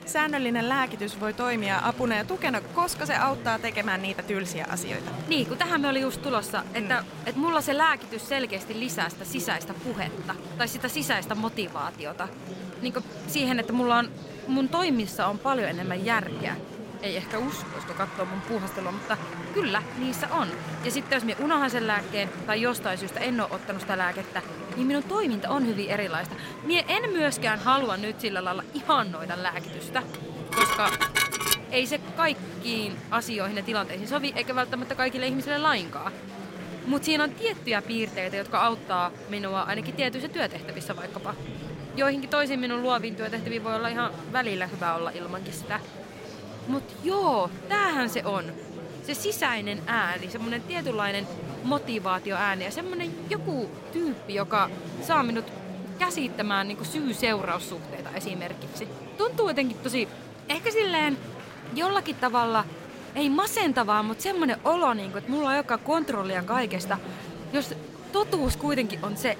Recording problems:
murmuring crowd; noticeable; throughout; 10 dB below the speech
clattering dishes; loud; from 30 to 32 s; peak 5 dB above the speech

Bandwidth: 16 kHz